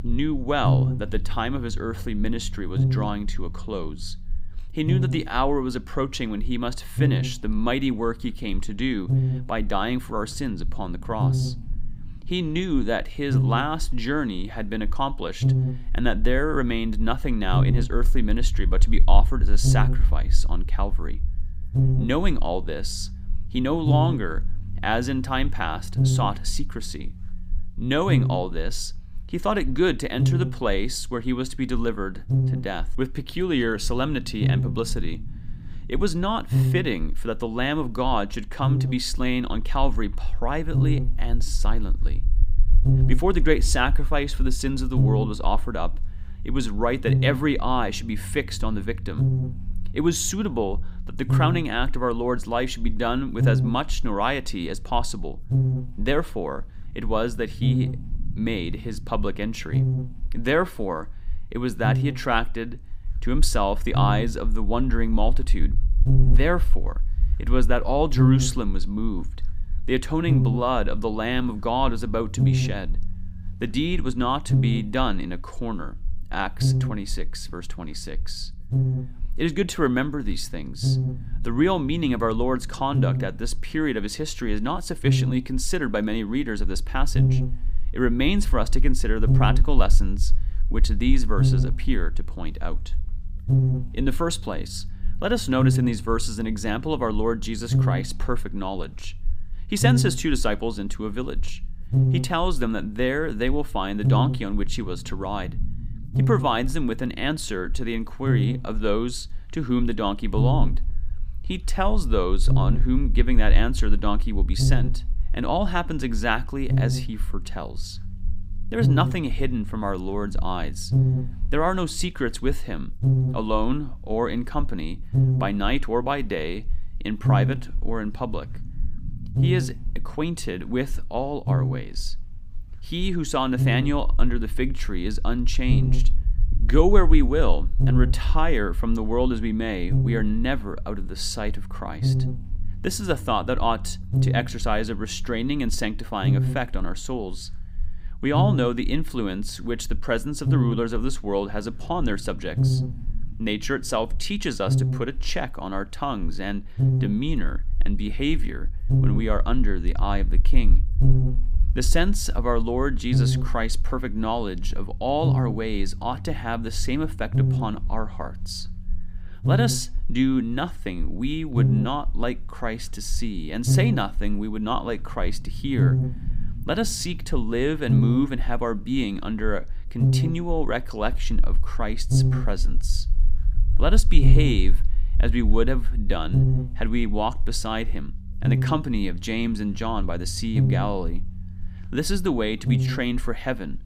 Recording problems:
electrical hum; loud; throughout; 50 Hz, 7 dB below the speech
low rumble; faint; throughout; 25 dB below the speech

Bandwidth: 15.5 kHz